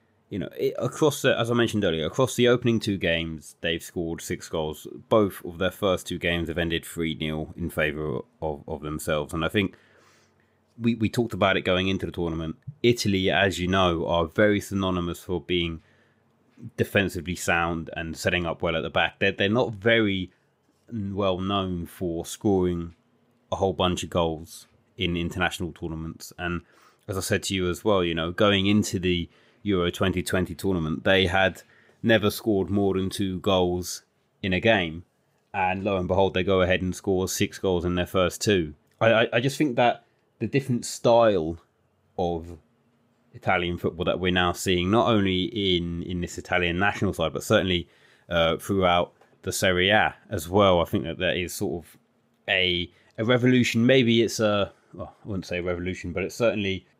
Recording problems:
none

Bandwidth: 15.5 kHz